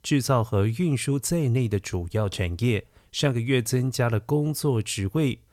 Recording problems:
none

